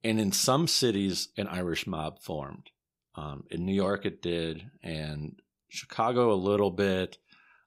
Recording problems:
none

